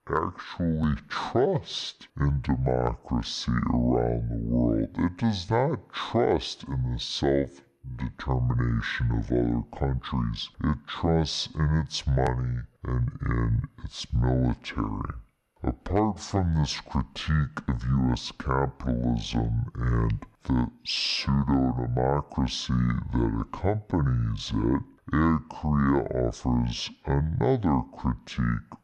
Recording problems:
wrong speed and pitch; too slow and too low; 0.6 times normal speed

